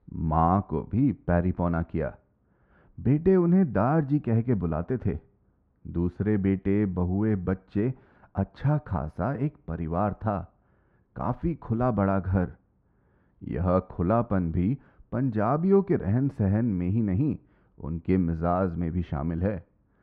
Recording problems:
muffled; very; fading above 1.5 kHz

